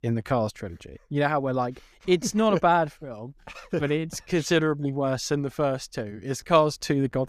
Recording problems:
none

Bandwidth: 14.5 kHz